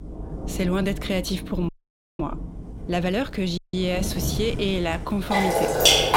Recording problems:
rain or running water; very loud; throughout; 1 dB above the speech
electrical hum; faint; throughout; 50 Hz, 25 dB below the speech
uneven, jittery; strongly; from 1.5 to 5.5 s
audio cutting out; at 1.5 s for 0.5 s and at 3.5 s

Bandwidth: 16 kHz